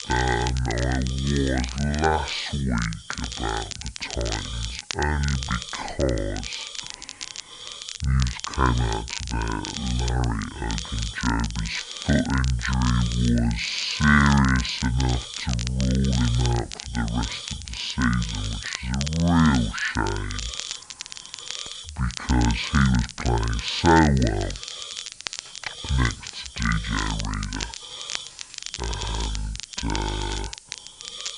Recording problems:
wrong speed and pitch; too slow and too low; 0.6 times normal speed
high frequencies cut off; noticeable; nothing above 8 kHz
hiss; noticeable; throughout; 15 dB below the speech
crackle, like an old record; noticeable; 10 dB below the speech
jangling keys; faint; from 20 to 22 s; peak 15 dB below the speech
footsteps; faint; from 24 to 30 s; peak 15 dB below the speech

